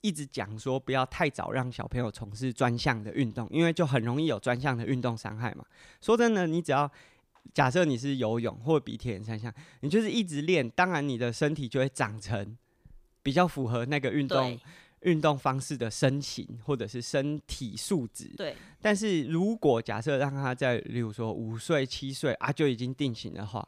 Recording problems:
none

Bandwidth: 15 kHz